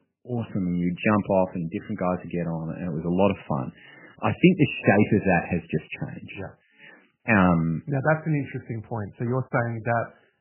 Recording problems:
garbled, watery; badly; nothing above 3 kHz

